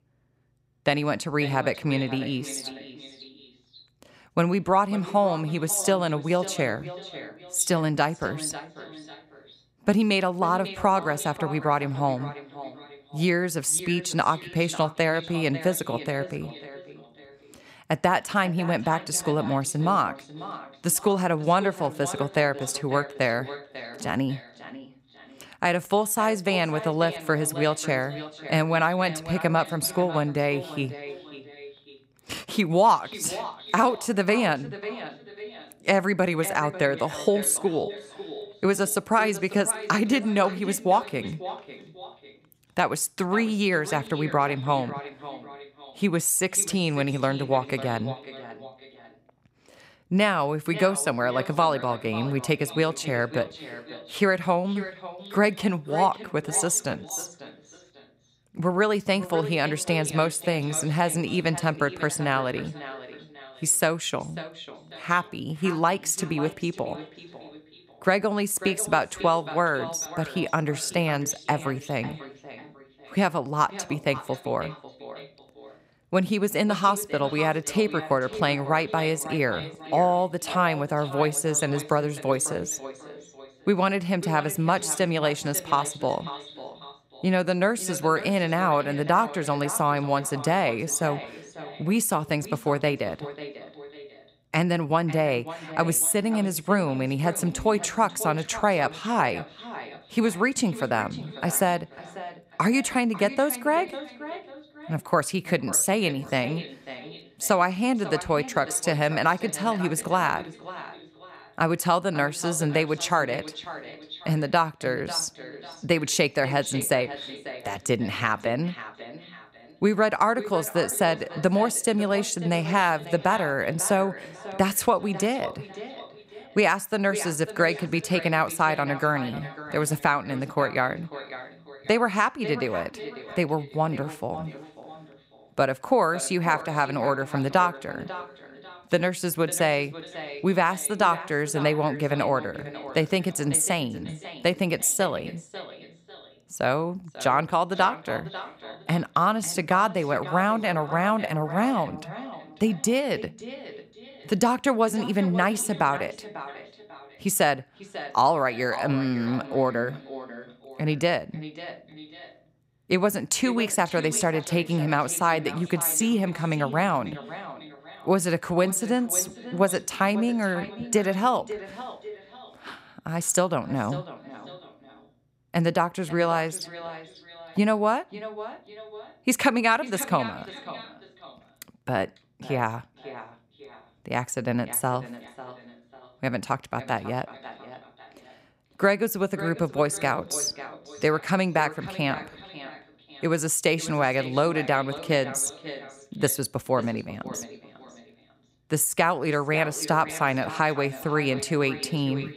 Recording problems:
echo of what is said; noticeable; throughout; 540 ms later, 15 dB below the speech

